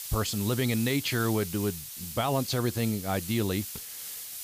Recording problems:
hiss; loud; throughout; 8 dB below the speech

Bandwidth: 15 kHz